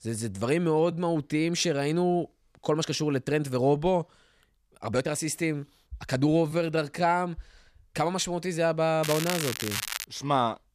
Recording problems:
crackling; loud; from 9 to 10 s; 5 dB below the speech
uneven, jittery; strongly; from 0.5 to 10 s

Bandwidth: 14.5 kHz